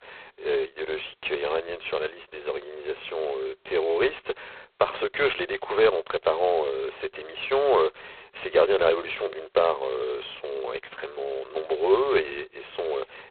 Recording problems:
phone-call audio; poor line; nothing above 4 kHz

